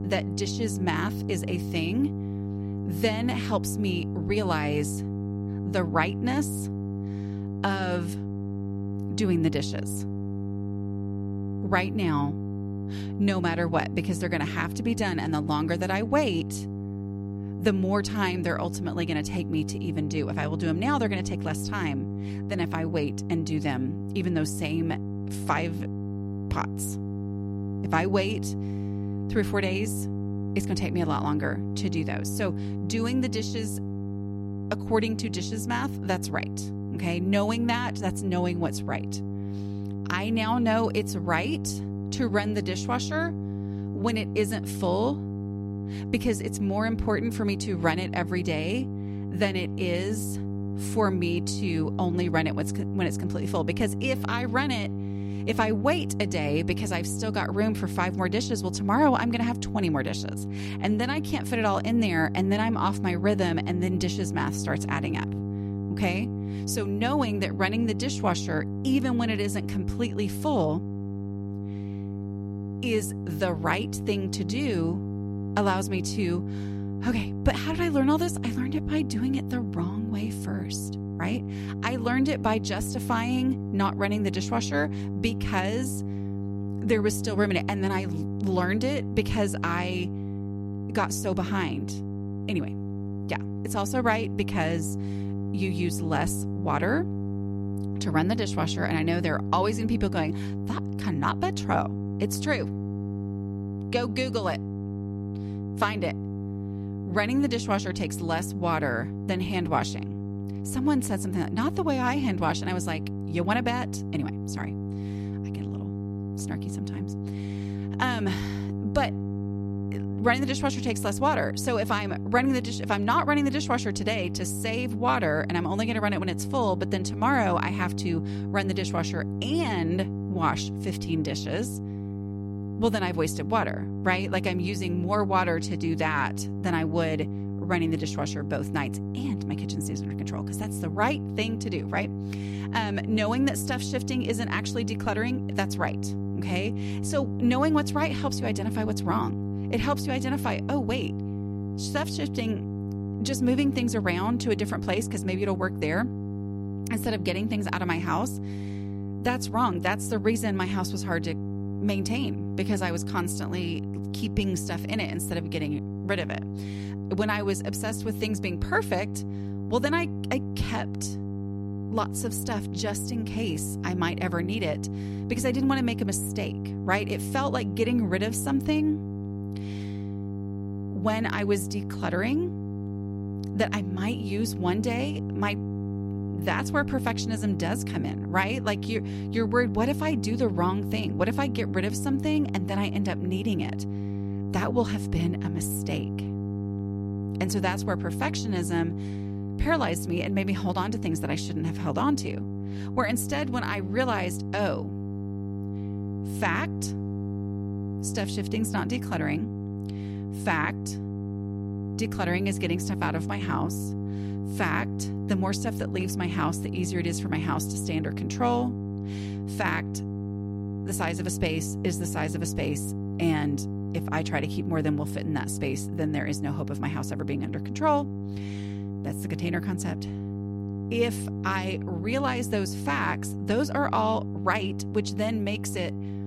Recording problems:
electrical hum; noticeable; throughout; 50 Hz, 10 dB below the speech

